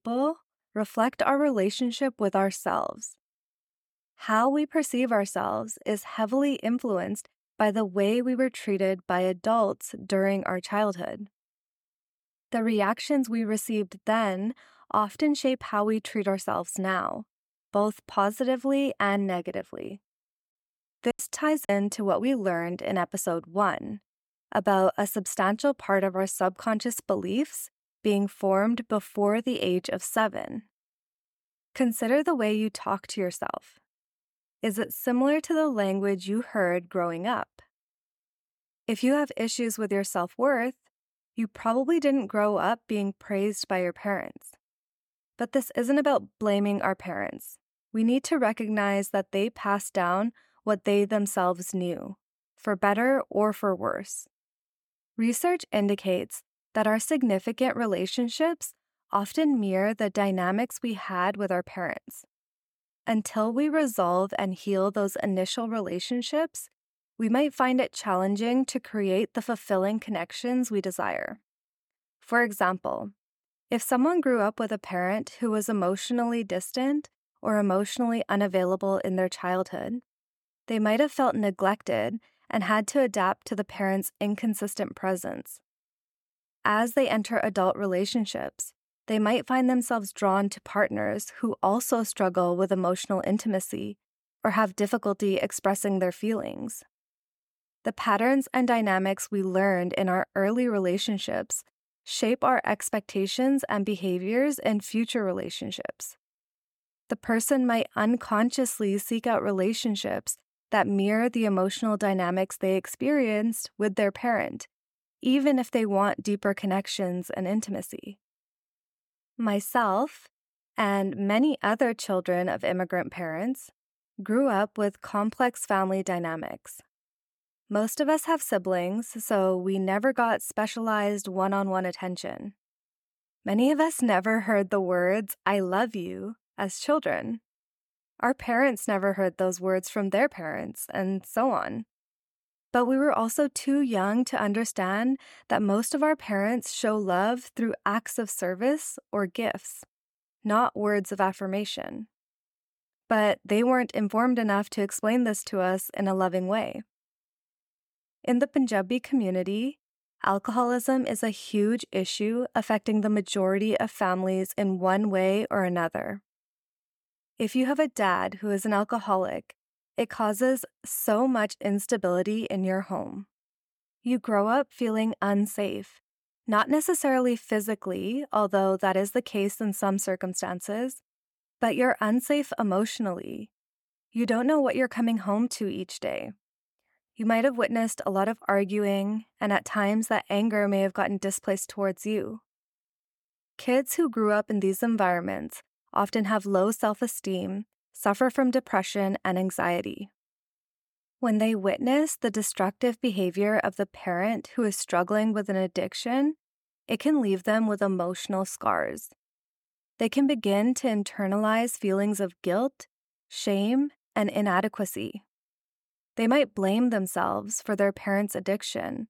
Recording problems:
choppy; occasionally; at 21 s; 5% of the speech affected

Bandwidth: 17.5 kHz